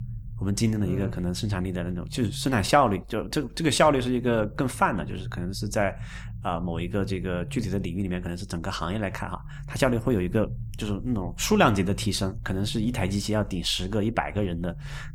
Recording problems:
low rumble; faint; throughout; 25 dB below the speech

